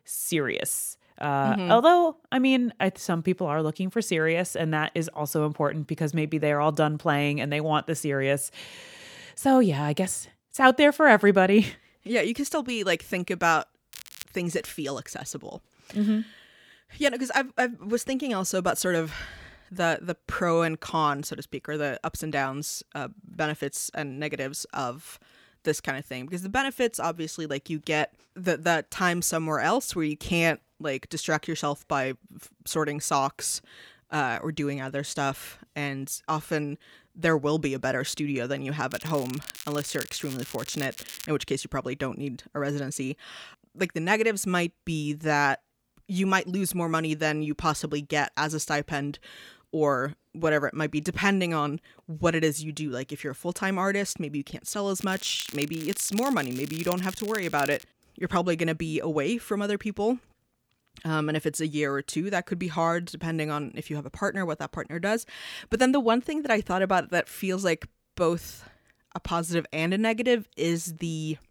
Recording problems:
crackling; noticeable; at 14 s, from 39 to 41 s and from 55 to 58 s; 15 dB below the speech

